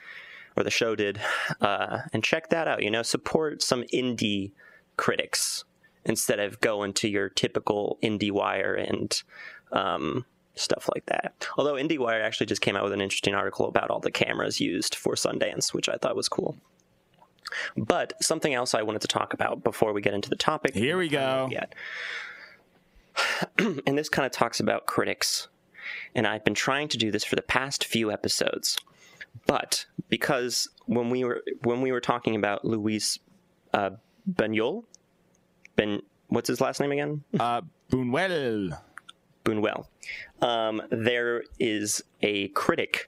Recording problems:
squashed, flat; heavily

